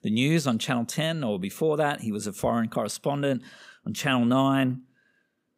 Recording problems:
none

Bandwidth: 15.5 kHz